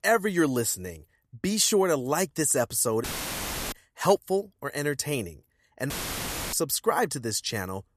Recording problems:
audio cutting out; filled with static; at 3 s for 0.5 s and at 6 s for 0.5 s

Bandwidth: 14.5 kHz